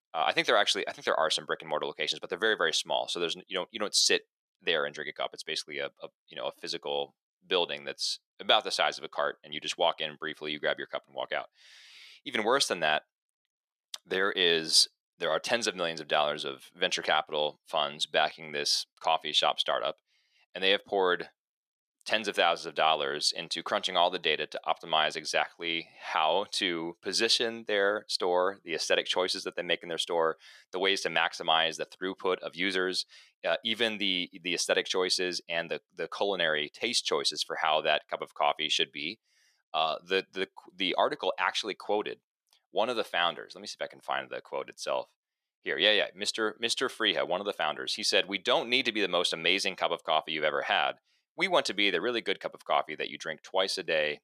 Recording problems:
thin; somewhat; fading below 500 Hz

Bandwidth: 14.5 kHz